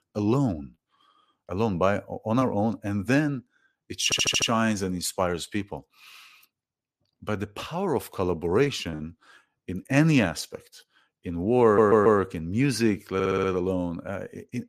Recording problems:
audio stuttering; at 4 s, at 12 s and at 13 s

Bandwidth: 14.5 kHz